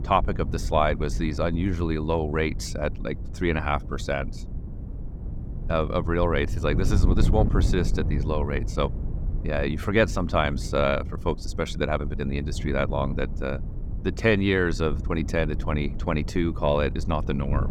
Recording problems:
wind noise on the microphone; occasional gusts; 15 dB below the speech

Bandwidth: 17.5 kHz